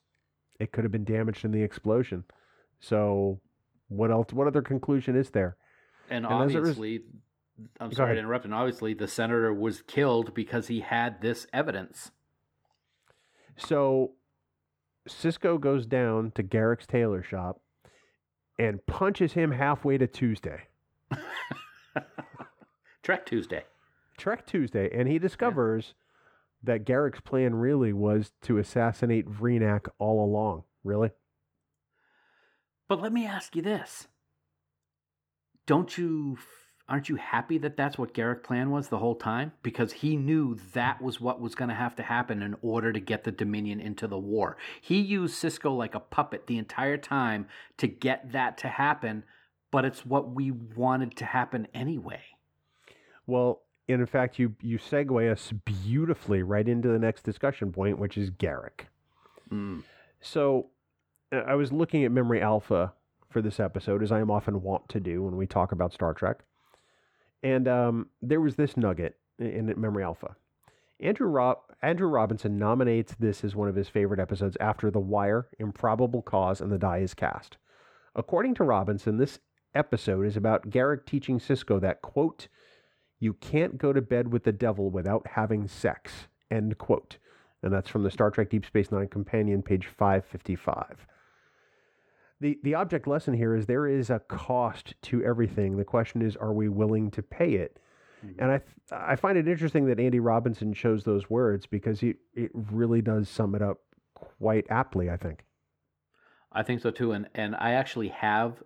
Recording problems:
muffled; slightly; fading above 3.5 kHz

